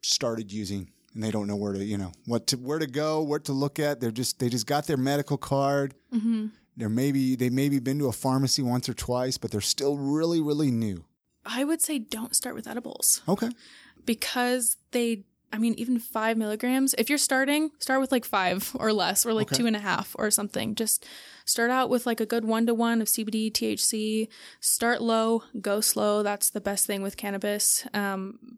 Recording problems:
none

